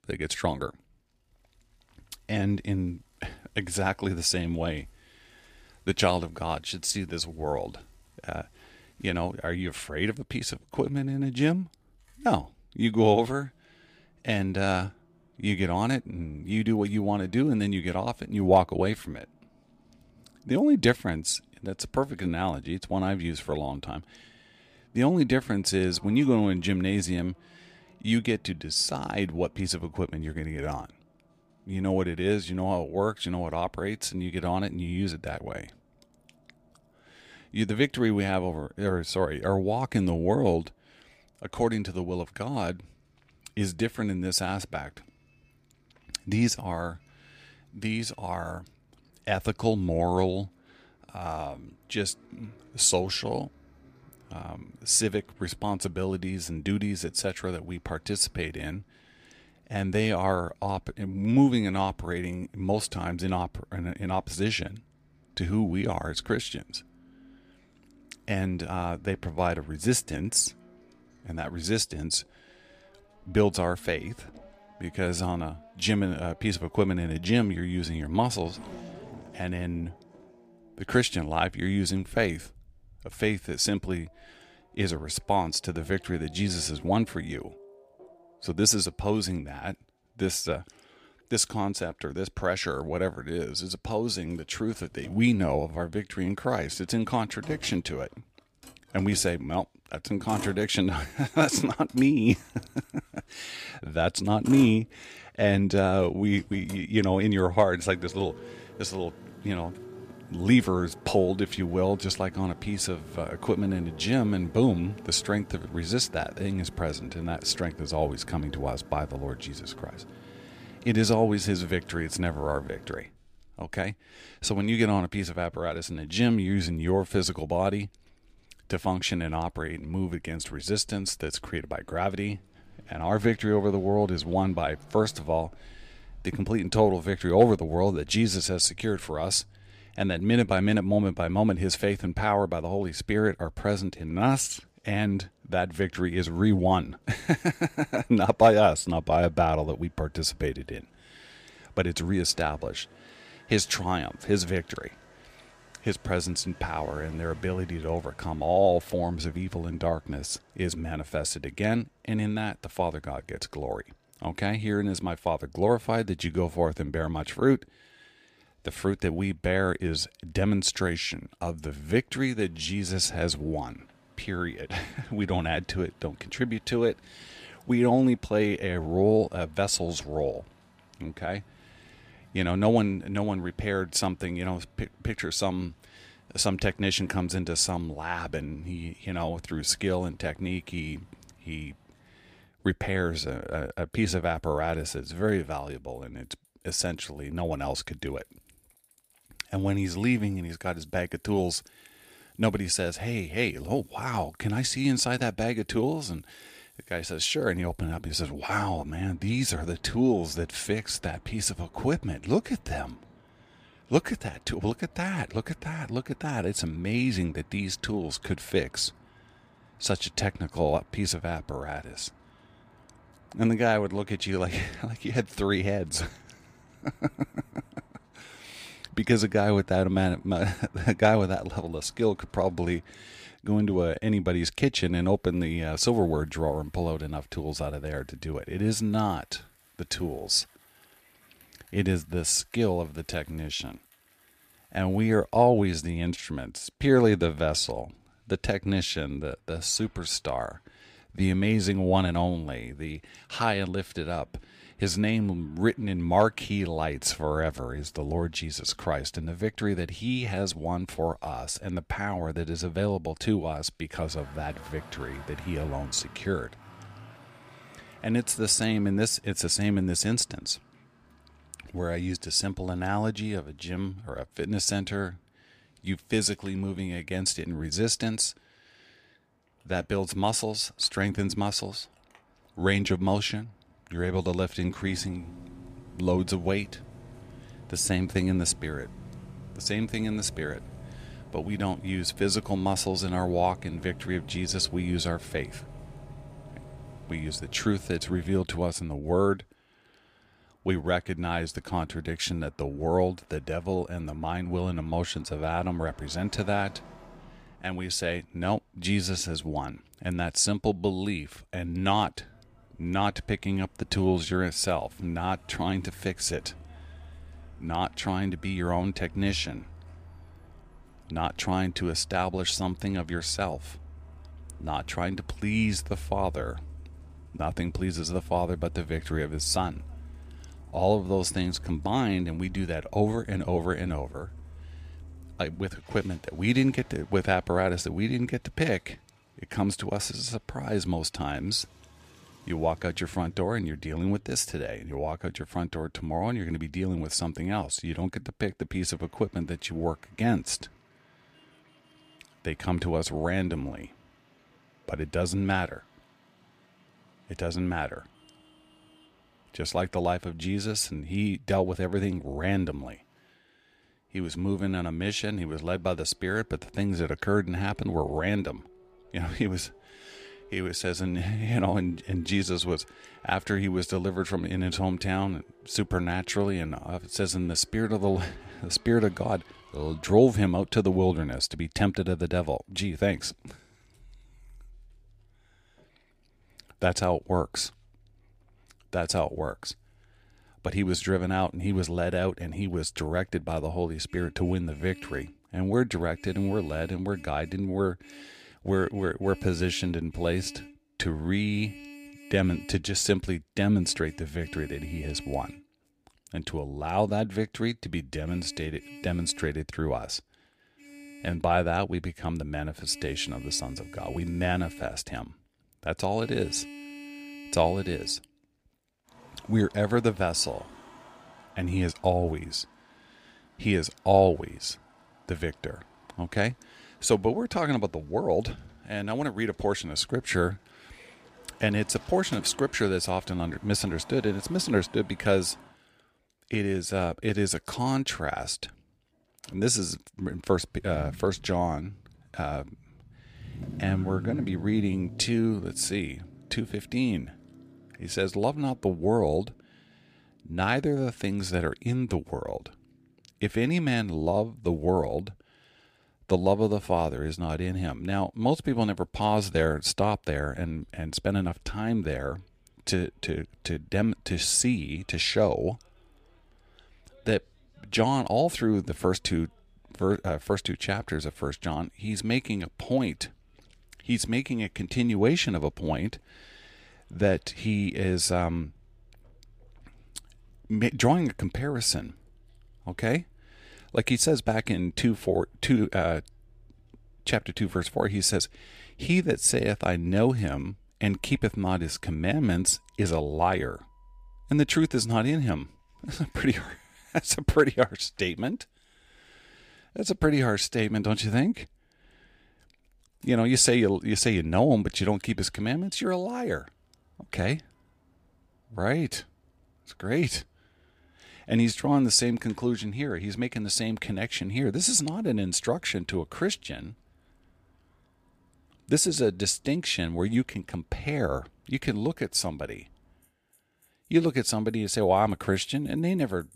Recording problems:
traffic noise; faint; throughout; 20 dB below the speech

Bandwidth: 15 kHz